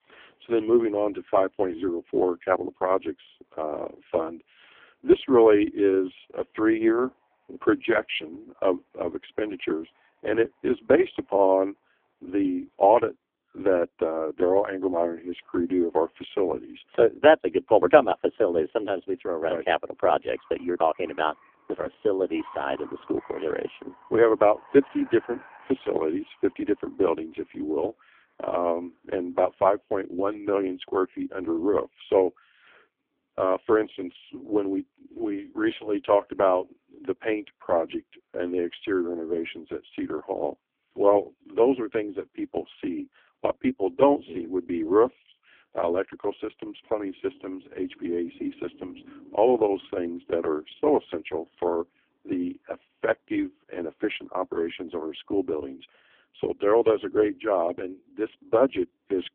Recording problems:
phone-call audio; poor line; nothing above 3.5 kHz
traffic noise; faint; throughout; 25 dB below the speech

